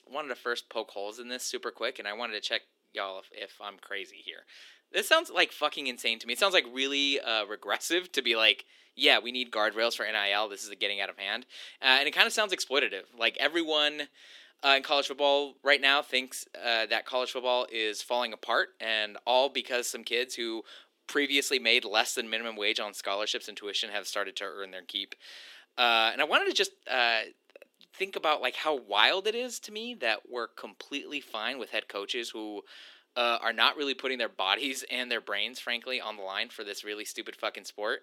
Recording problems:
thin; somewhat; fading below 300 Hz

